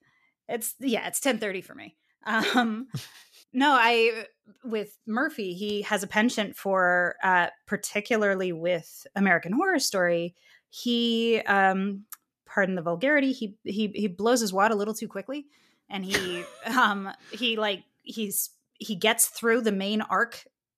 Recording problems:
none

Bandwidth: 14.5 kHz